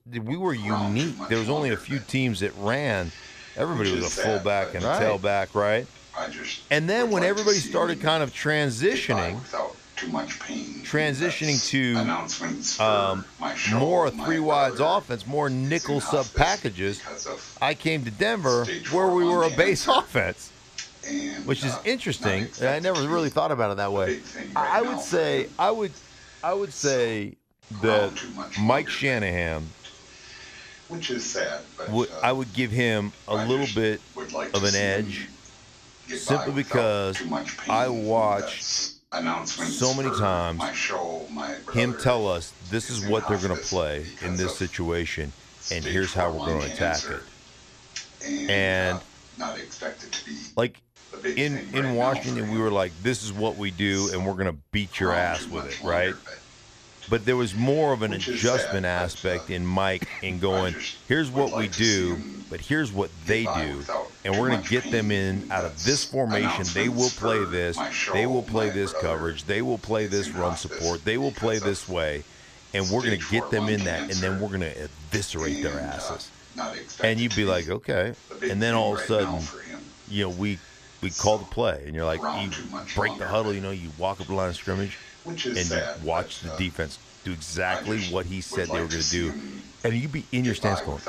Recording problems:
voice in the background; loud; throughout; 6 dB below the speech

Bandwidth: 14.5 kHz